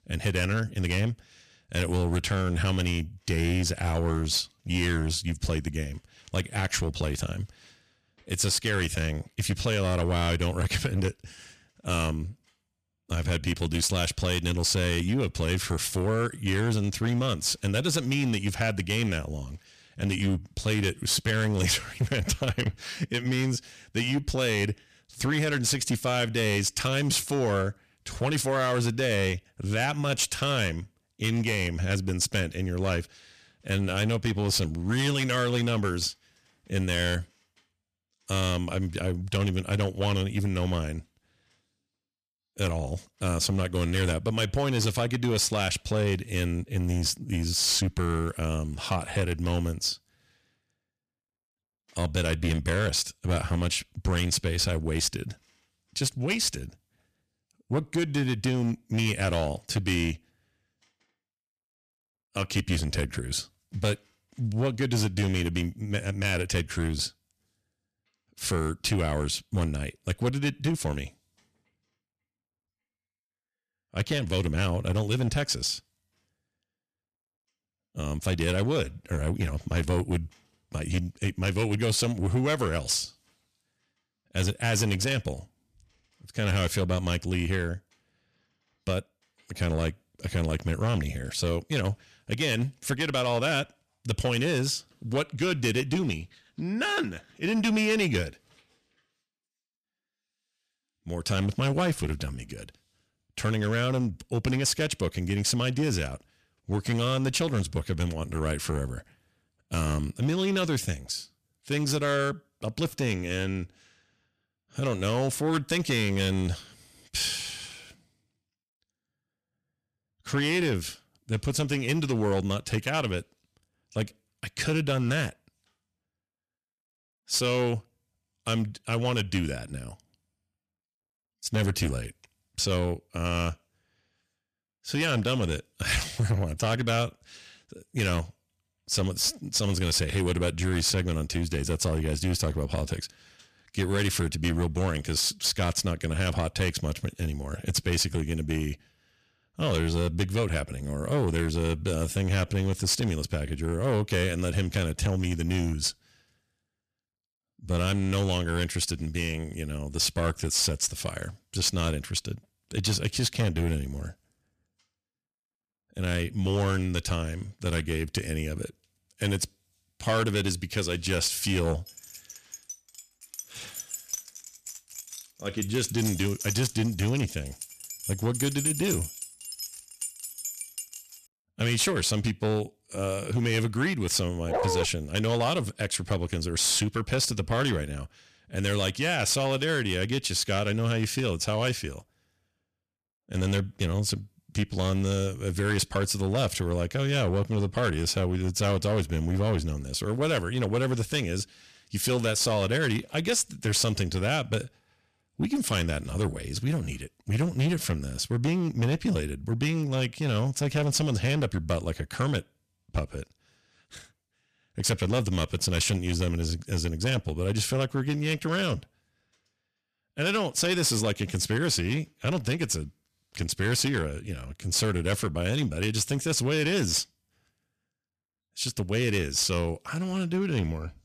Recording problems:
distortion; slight; 6% of the sound clipped
jangling keys; loud; from 2:52 to 3:01; peak 1 dB above the speech
dog barking; loud; at 3:04; peak level with the speech

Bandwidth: 14.5 kHz